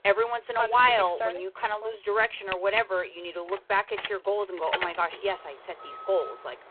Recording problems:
phone-call audio; poor line
traffic noise; loud; throughout; 8 dB below the speech

